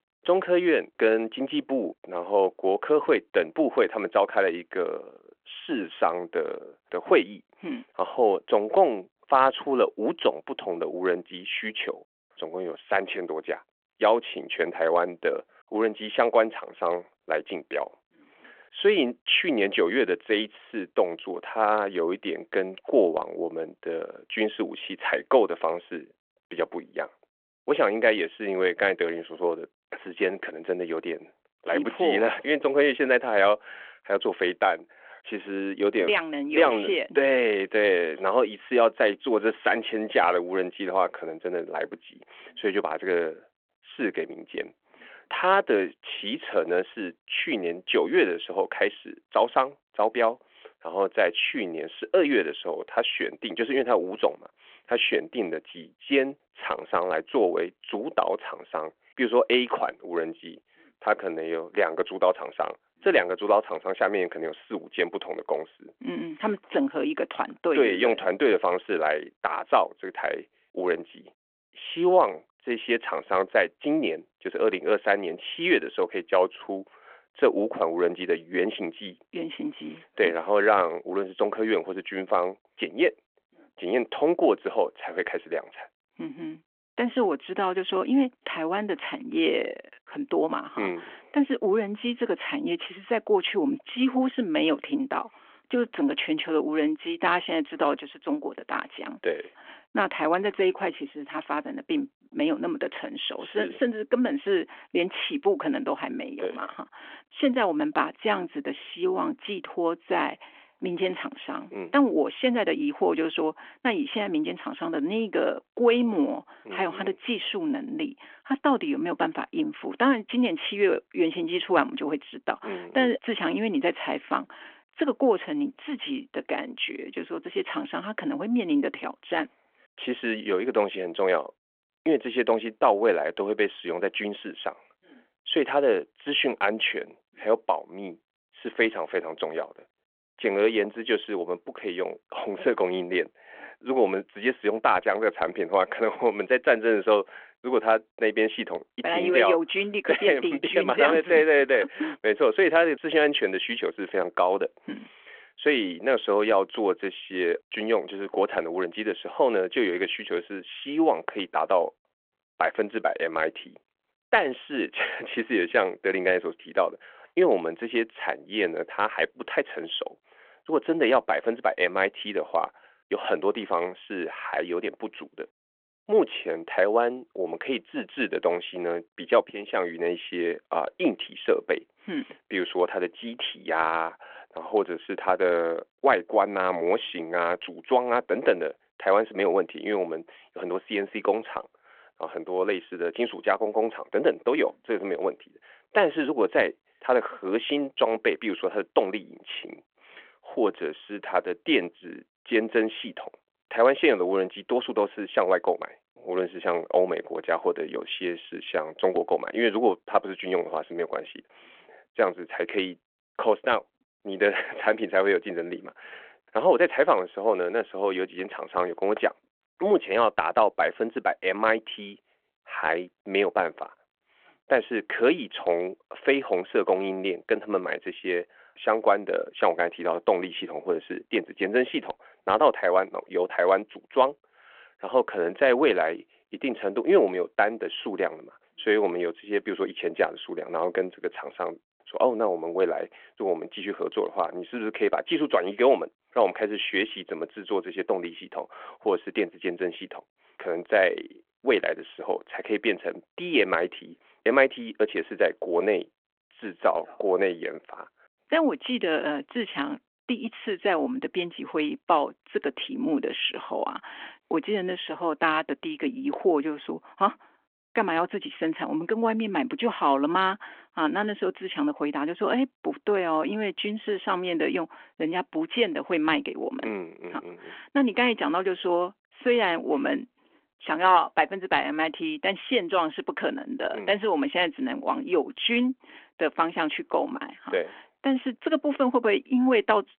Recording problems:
phone-call audio

